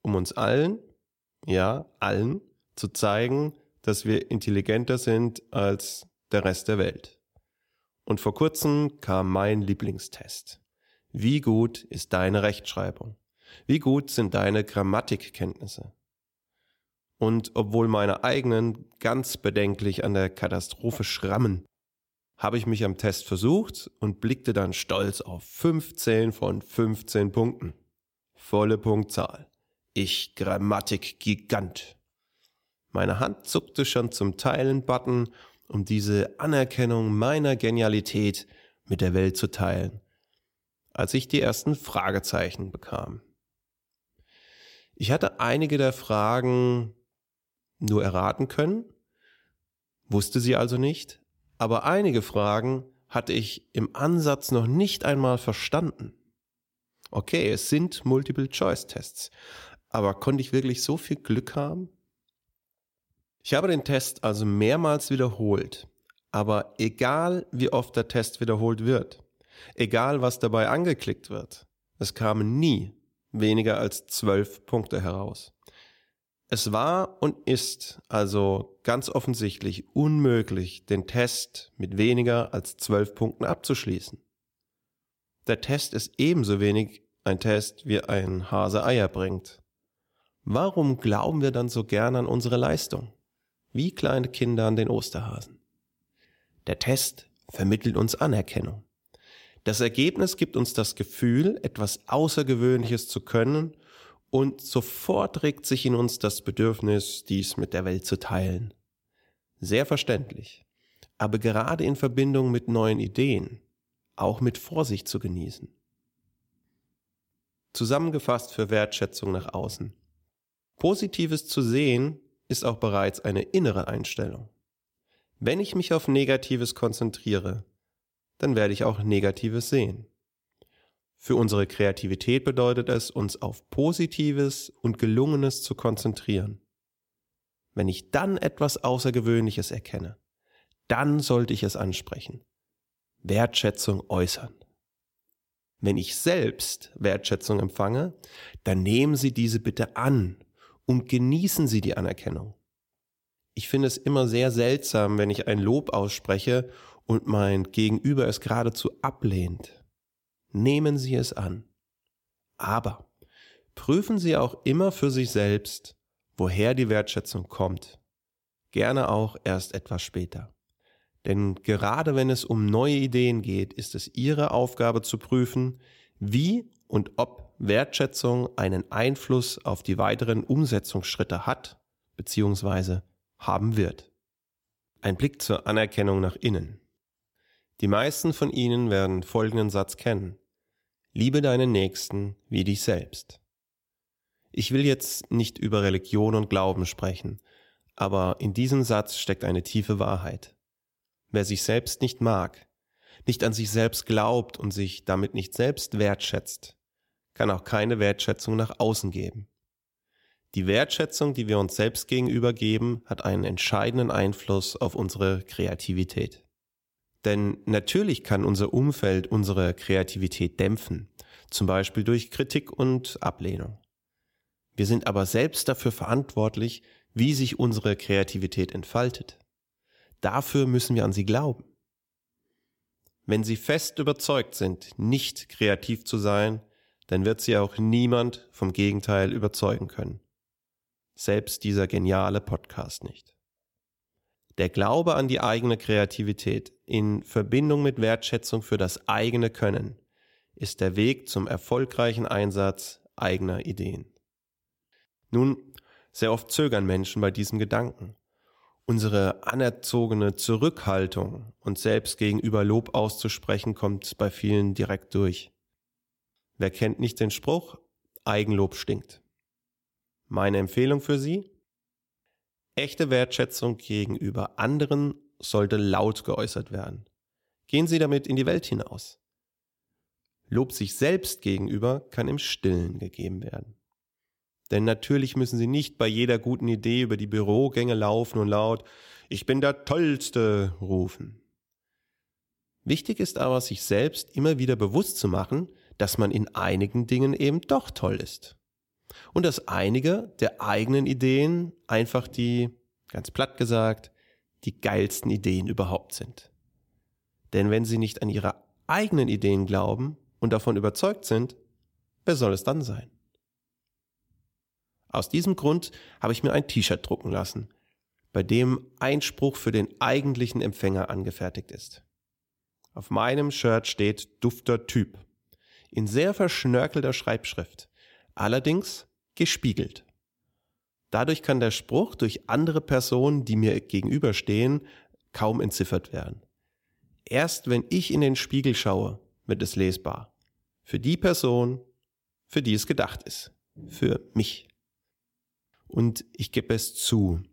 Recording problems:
none

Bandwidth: 16.5 kHz